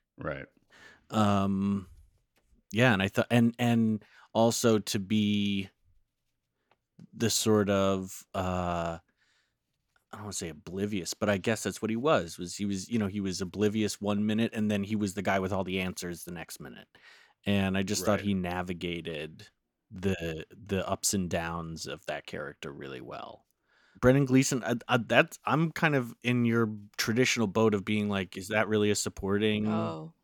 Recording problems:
none

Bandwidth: 18 kHz